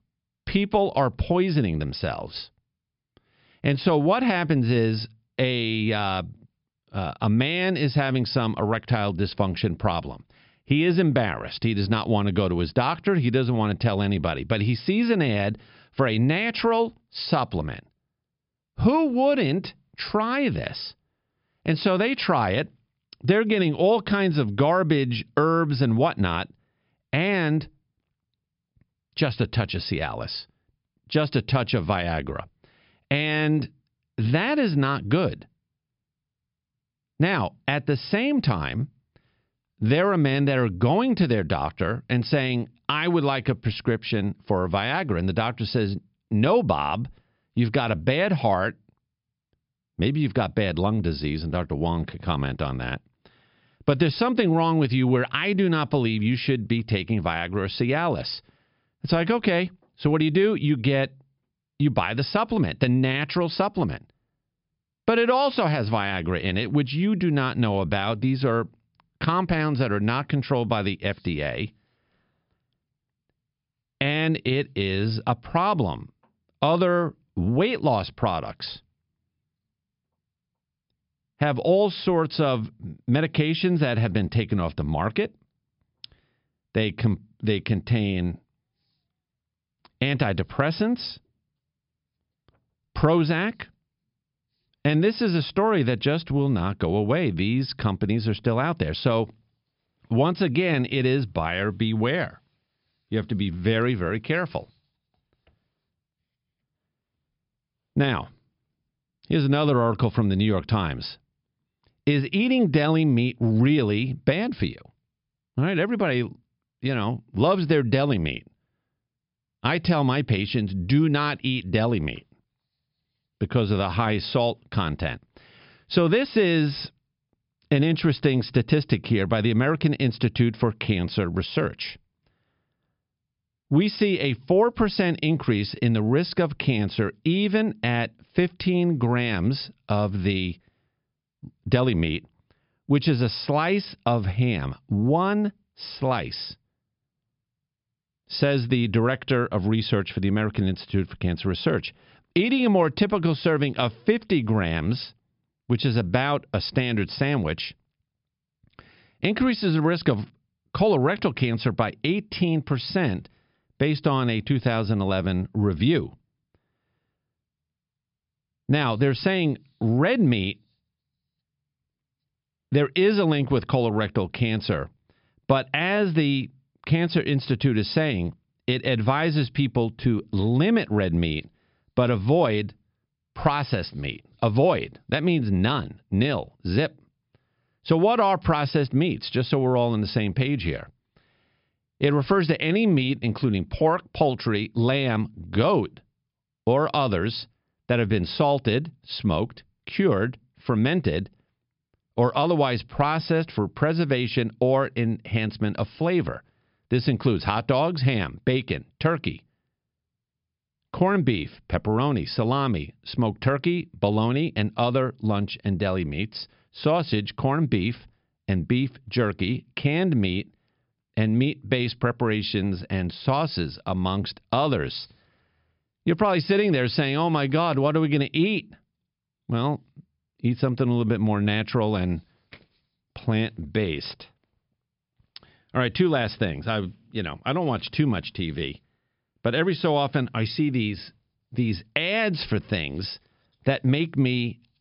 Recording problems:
high frequencies cut off; noticeable; nothing above 5.5 kHz

